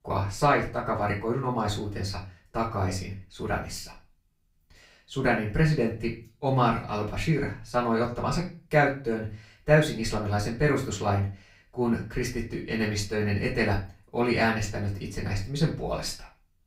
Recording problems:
off-mic speech; far
room echo; slight; dies away in 0.3 s

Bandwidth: 15.5 kHz